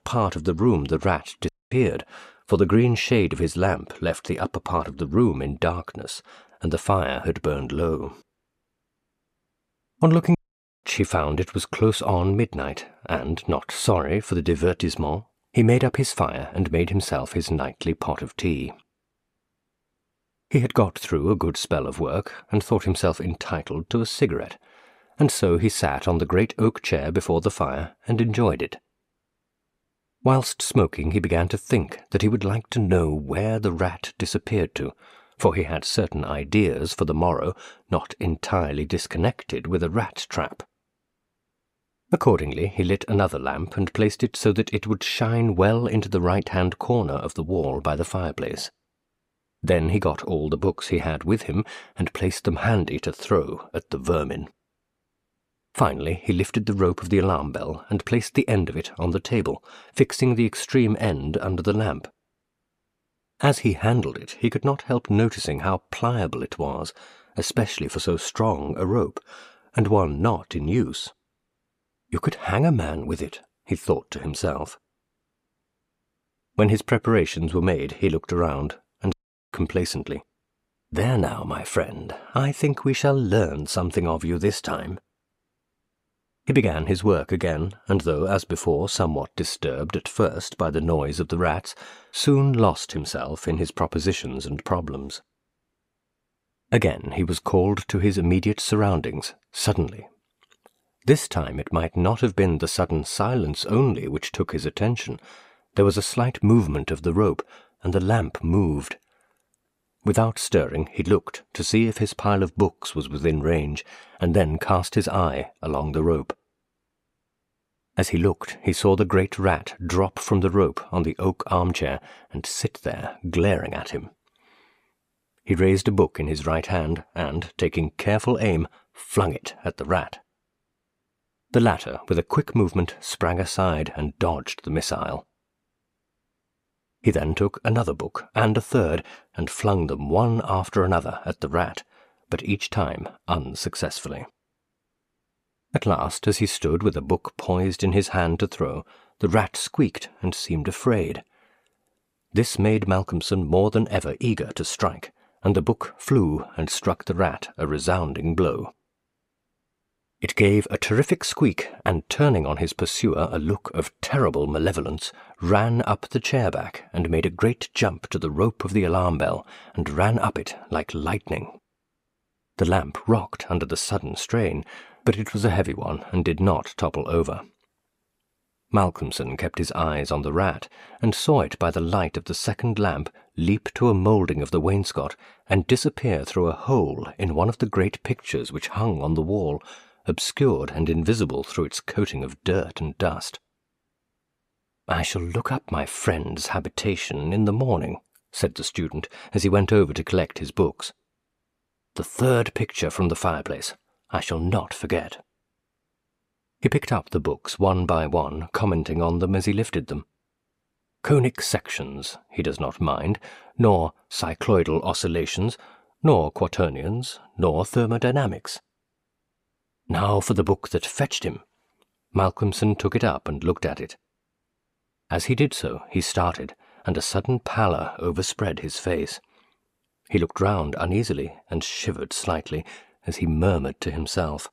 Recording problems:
audio cutting out; at 1.5 s, at 10 s and at 1:19

